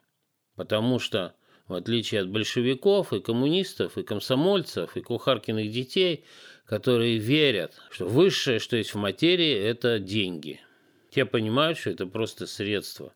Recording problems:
none

